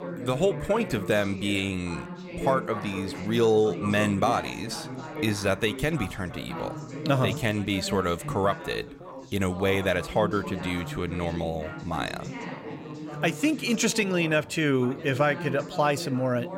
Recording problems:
background chatter; loud; throughout; 3 voices, 10 dB below the speech

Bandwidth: 16 kHz